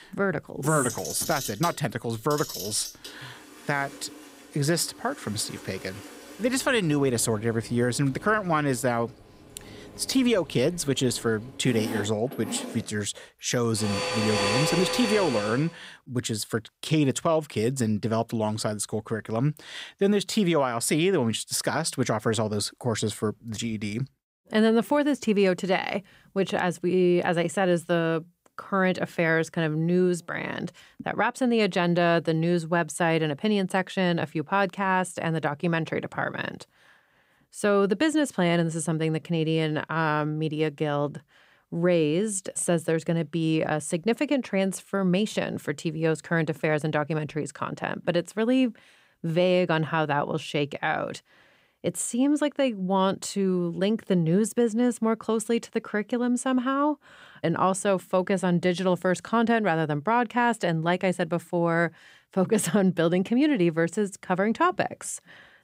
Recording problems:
household noises; loud; until 15 s; 7 dB below the speech

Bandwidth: 15.5 kHz